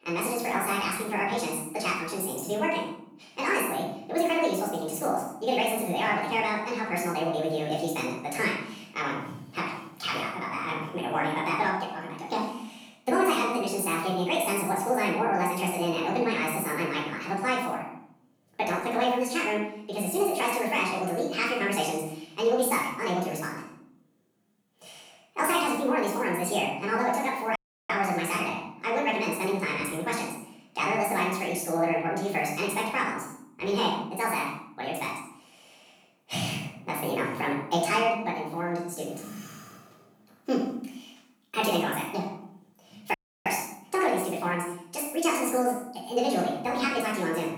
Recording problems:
off-mic speech; far
wrong speed and pitch; too fast and too high; 1.7 times normal speed
room echo; noticeable; dies away in 0.7 s
audio cutting out; at 28 s and at 43 s

